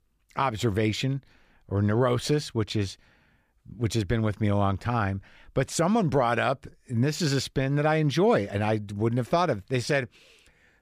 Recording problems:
none

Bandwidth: 15 kHz